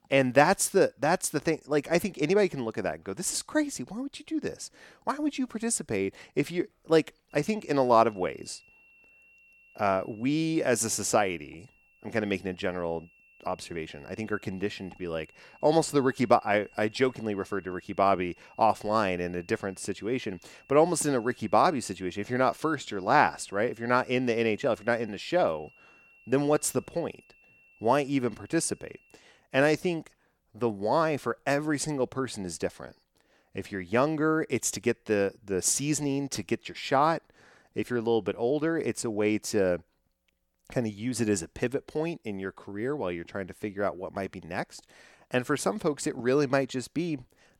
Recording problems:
high-pitched whine; faint; from 7.5 to 29 s; 2.5 kHz, 30 dB below the speech

